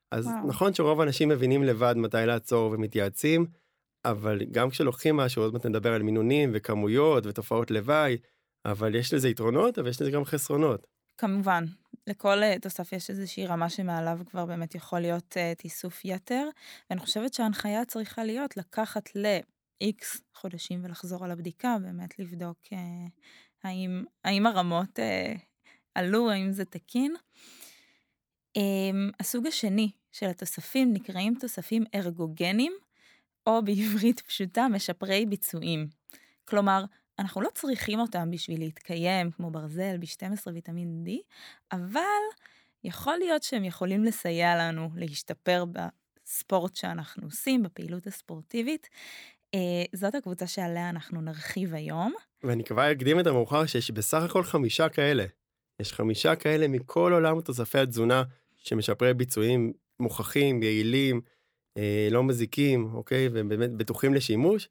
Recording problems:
none

